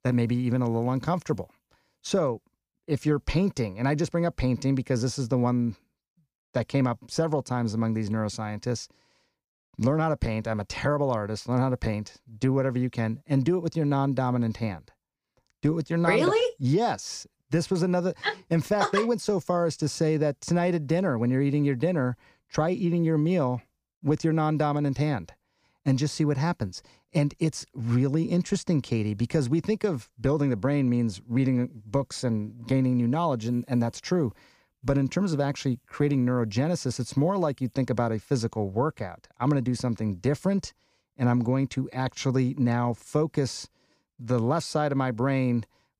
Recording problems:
none

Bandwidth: 15 kHz